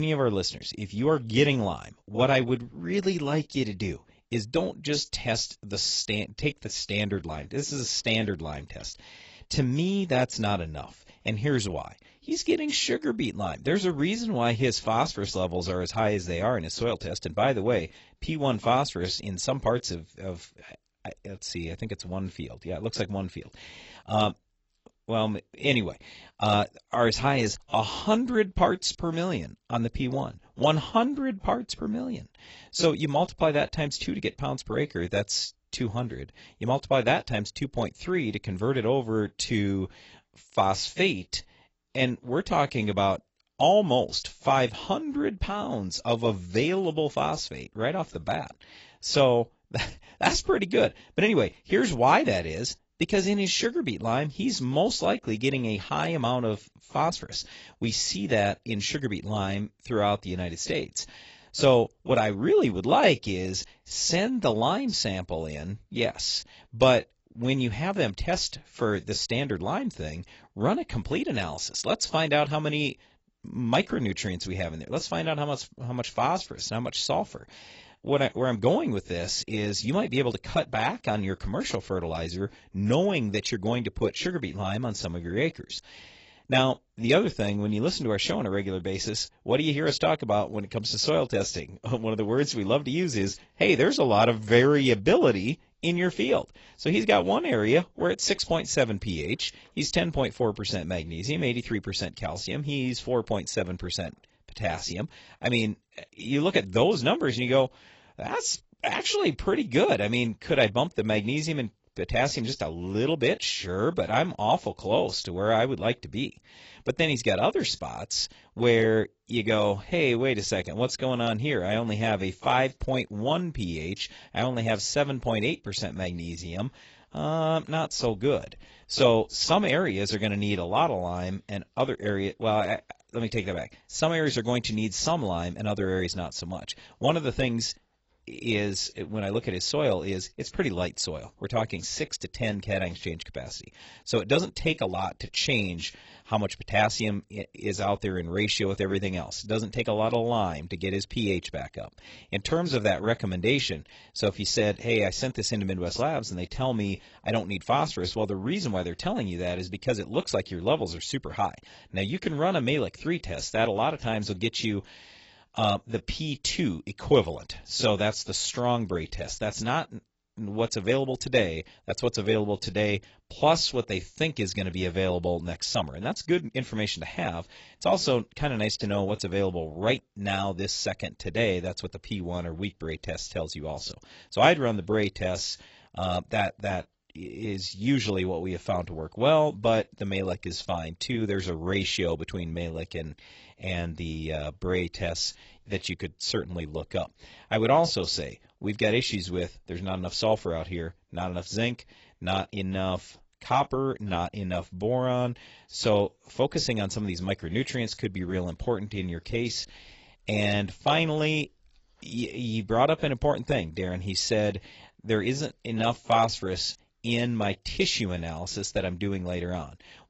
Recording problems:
garbled, watery; badly; nothing above 8 kHz
abrupt cut into speech; at the start

